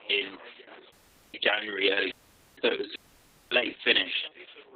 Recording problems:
garbled, watery; badly; nothing above 3.5 kHz
thin; somewhat; fading below 250 Hz
background chatter; faint; throughout; 2 voices, 25 dB below the speech
audio cutting out; at 1 s, at 2 s and at 3 s for 0.5 s

